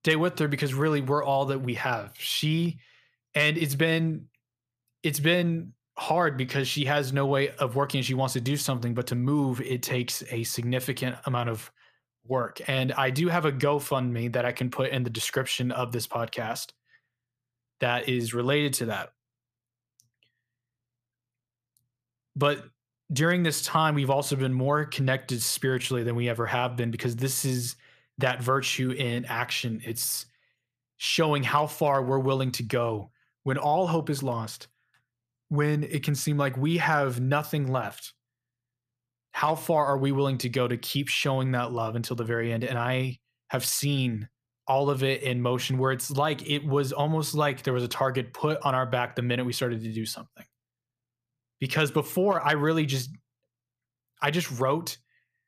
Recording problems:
none

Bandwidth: 14.5 kHz